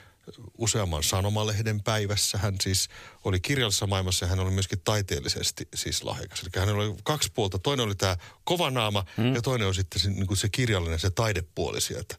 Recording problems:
none

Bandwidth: 15 kHz